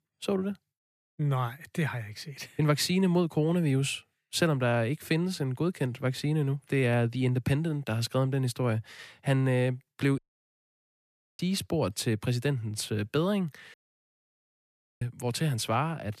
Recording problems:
audio cutting out; at 10 s for 1 s and at 14 s for 1.5 s

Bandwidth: 14.5 kHz